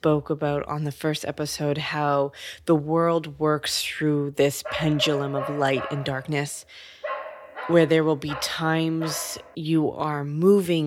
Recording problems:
dog barking; noticeable; from 4.5 to 9.5 s; peak 8 dB below the speech
abrupt cut into speech; at the end

